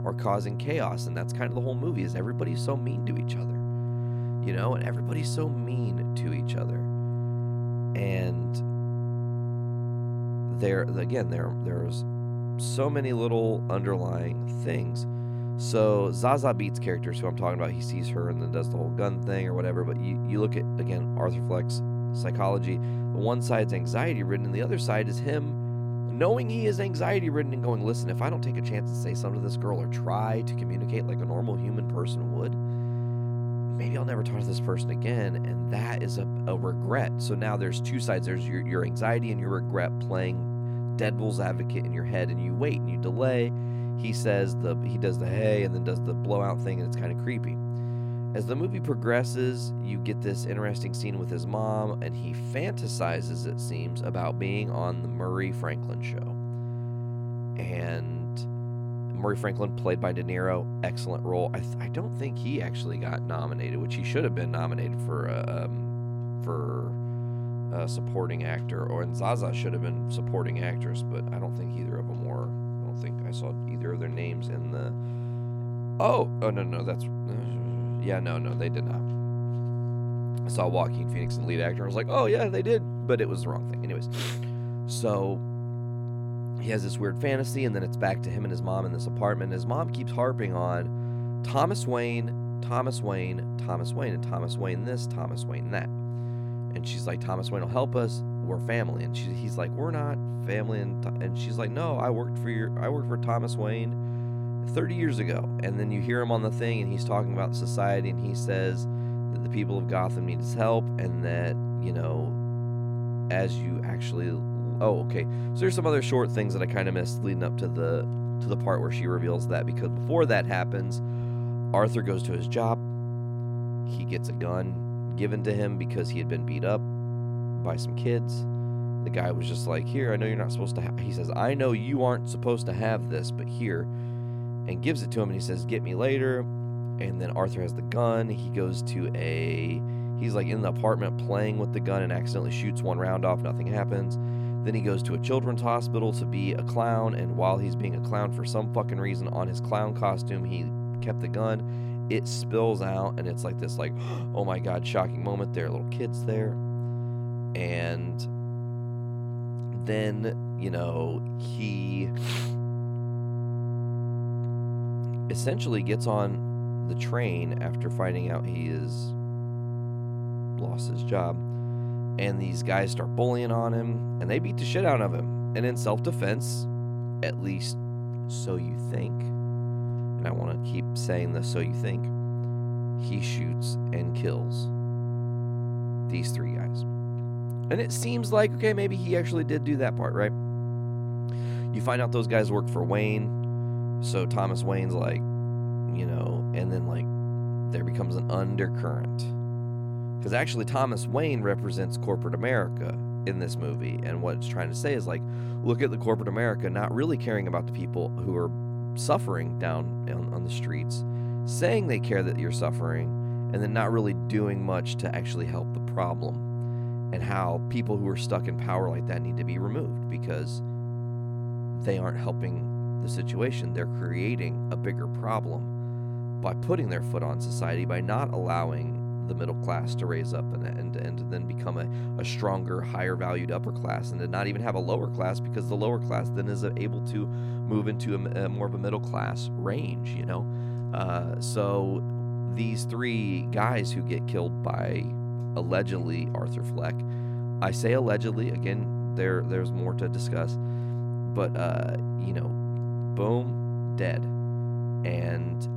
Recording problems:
electrical hum; loud; throughout; 60 Hz, 8 dB below the speech

